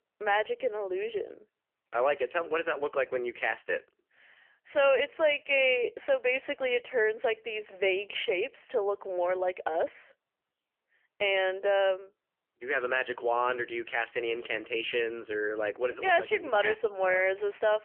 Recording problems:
phone-call audio; poor line; nothing above 3 kHz

